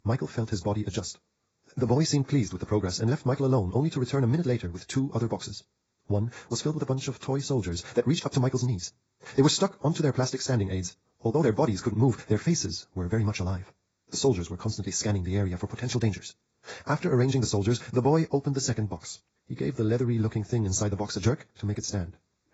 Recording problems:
garbled, watery; badly; nothing above 7.5 kHz
wrong speed, natural pitch; too fast; 1.8 times normal speed

